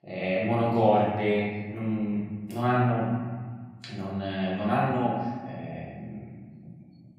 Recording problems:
off-mic speech; far
room echo; noticeable; dies away in 1.7 s

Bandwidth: 15.5 kHz